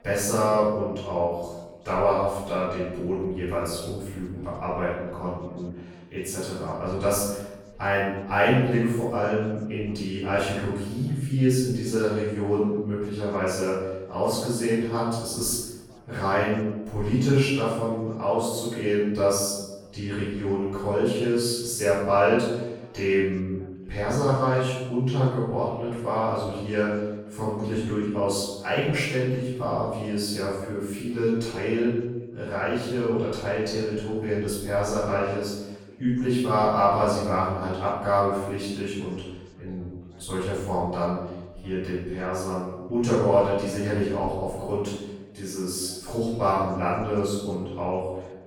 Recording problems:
room echo; strong; dies away in 0.9 s
off-mic speech; far
background chatter; faint; throughout; 3 voices, 30 dB below the speech

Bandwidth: 18 kHz